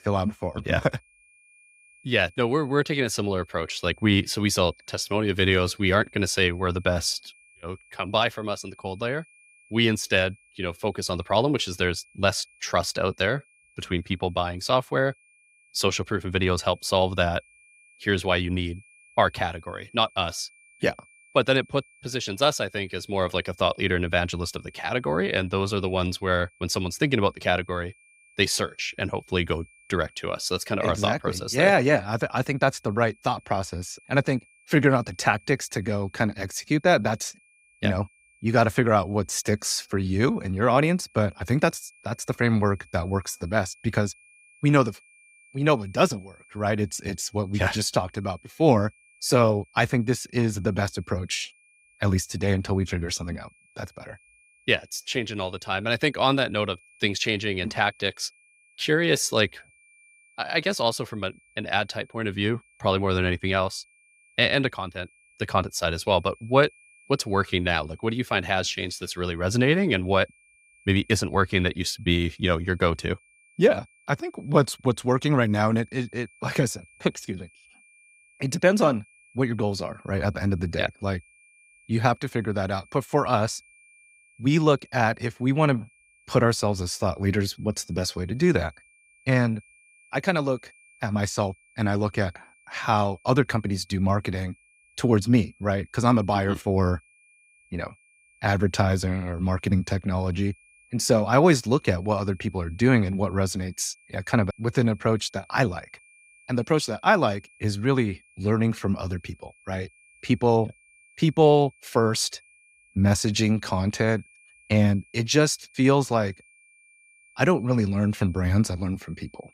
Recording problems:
high-pitched whine; faint; throughout; 2.5 kHz, 30 dB below the speech

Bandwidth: 15.5 kHz